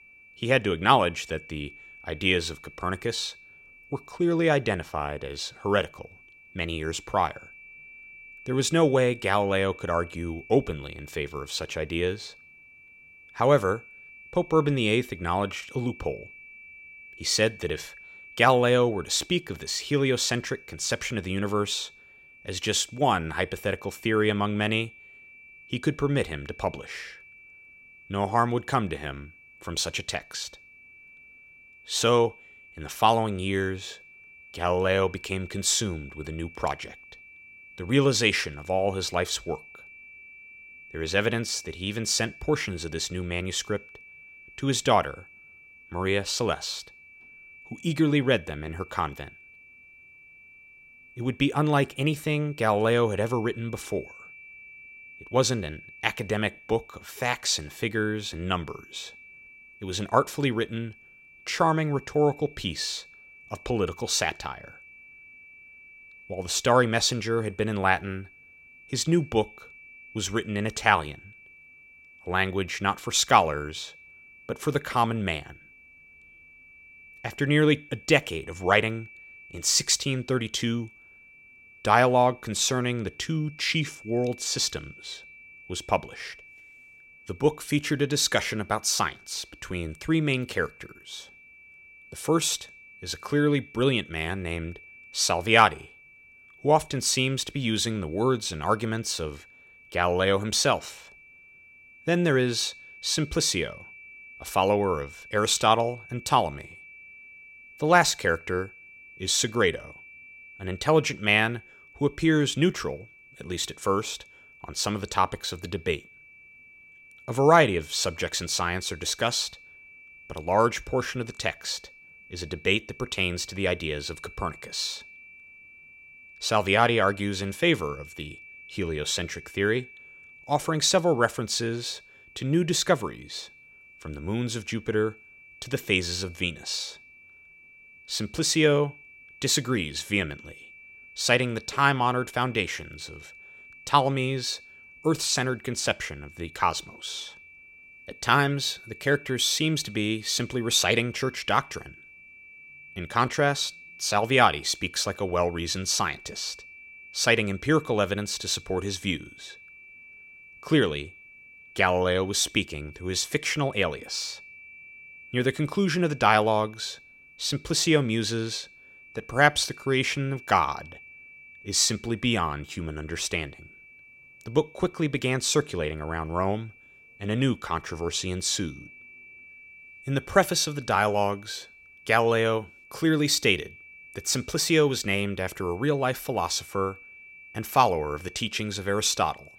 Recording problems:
high-pitched whine; faint; throughout; 2.5 kHz, 20 dB below the speech

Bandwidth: 16 kHz